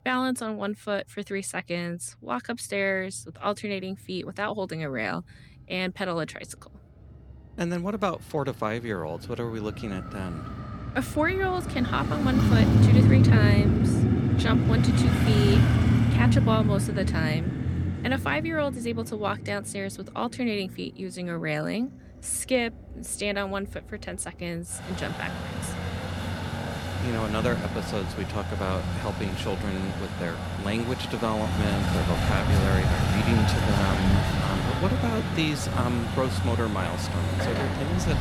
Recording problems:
traffic noise; very loud; throughout; 5 dB above the speech

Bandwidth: 18.5 kHz